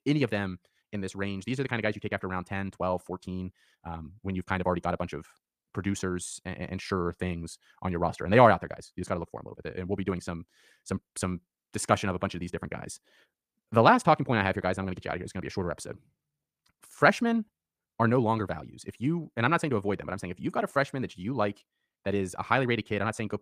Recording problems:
wrong speed, natural pitch; too fast; 1.6 times normal speed

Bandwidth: 15 kHz